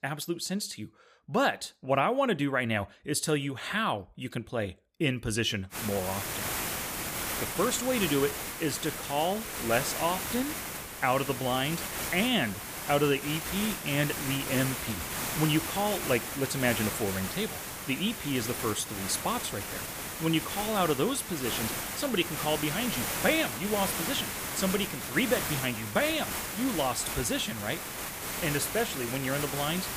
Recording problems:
hiss; loud; from 6 s on; 3 dB below the speech

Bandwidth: 15 kHz